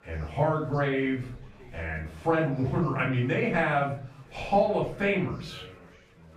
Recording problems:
off-mic speech; far
room echo; noticeable; dies away in 0.5 s
chatter from many people; faint; throughout; 25 dB below the speech

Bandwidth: 14.5 kHz